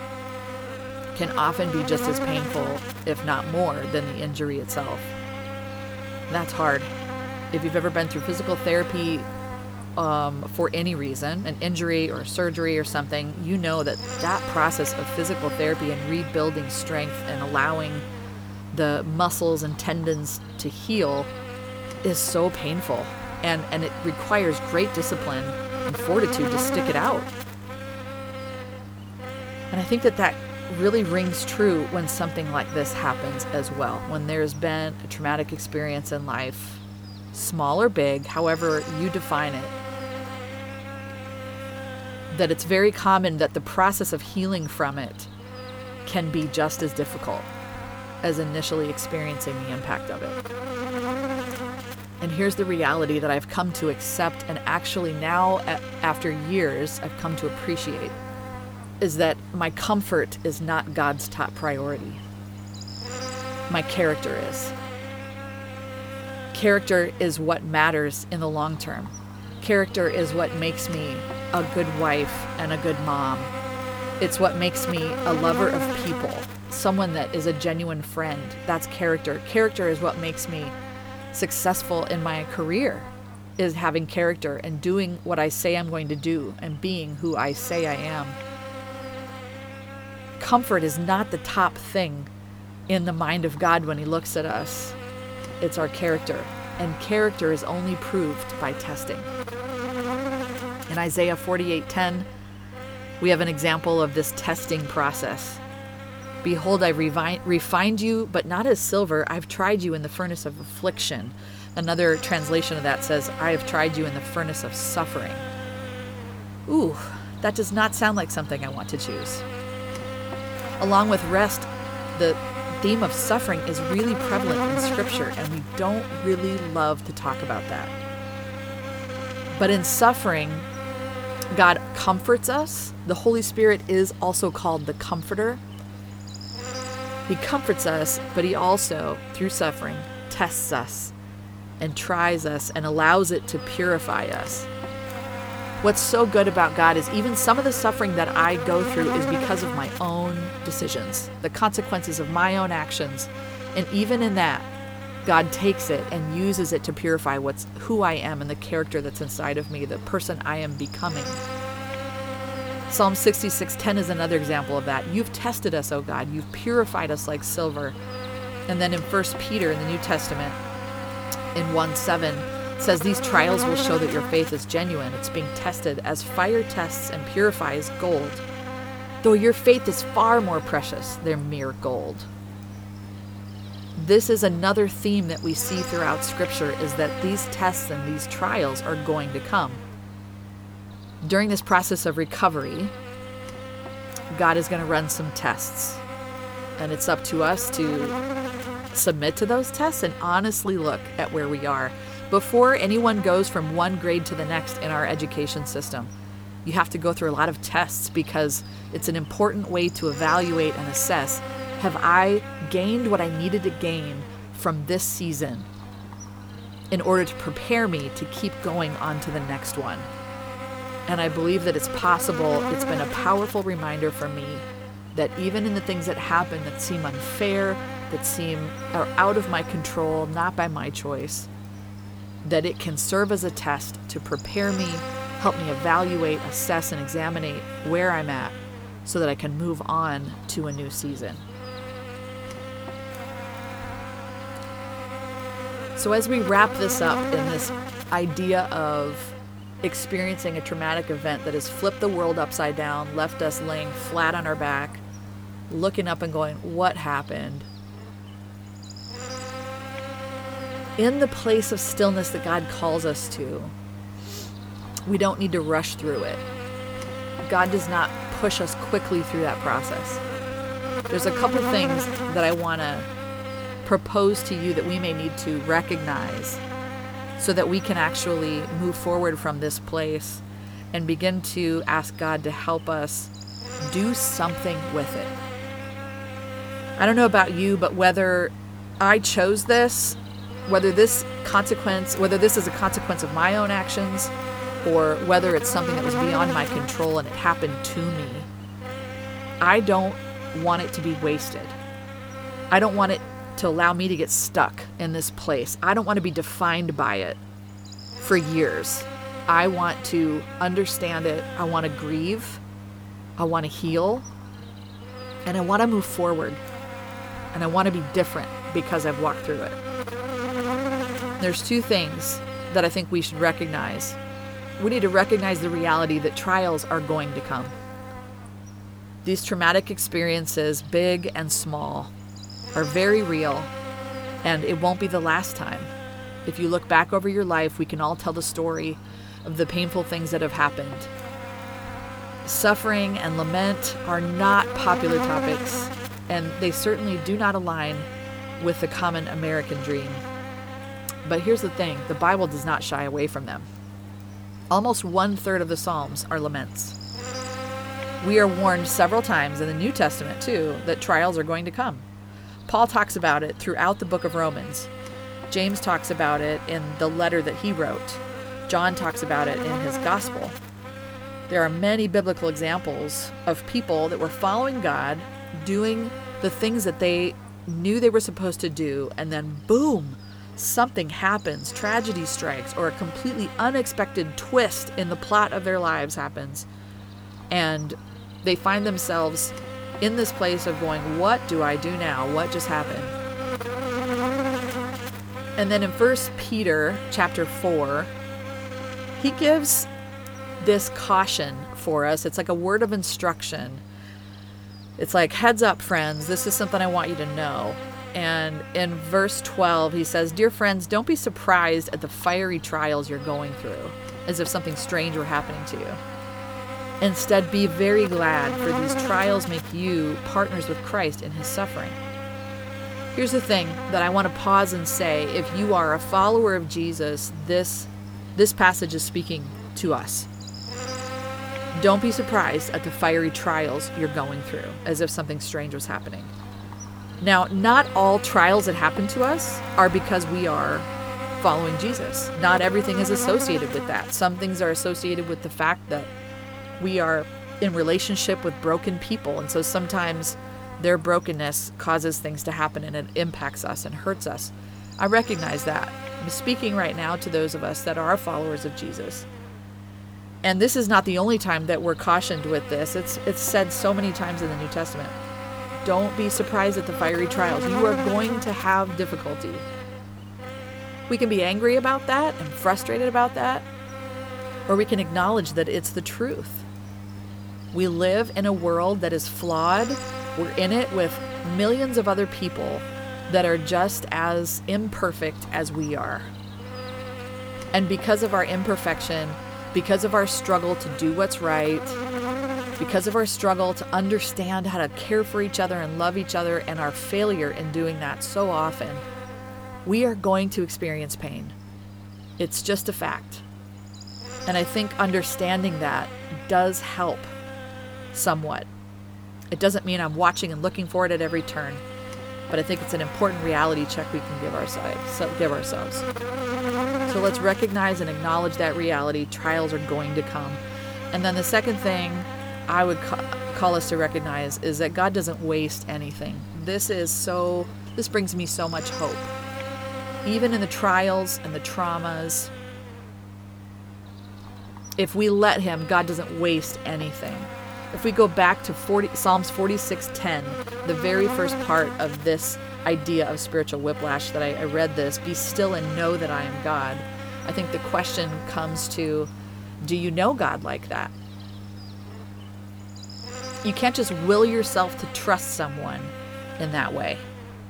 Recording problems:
electrical hum; loud; throughout; 50 Hz, 10 dB below the speech

